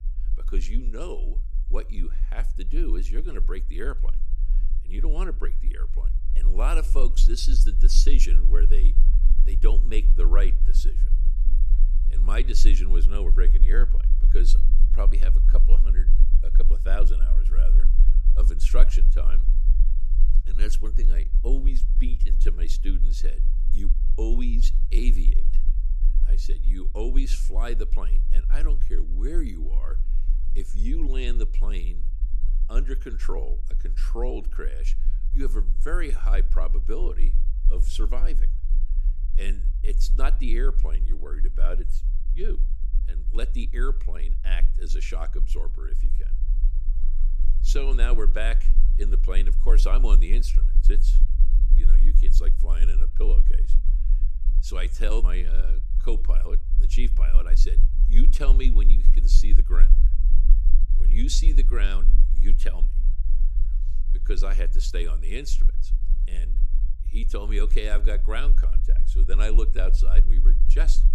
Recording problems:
low rumble; noticeable; throughout; 15 dB below the speech

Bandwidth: 14.5 kHz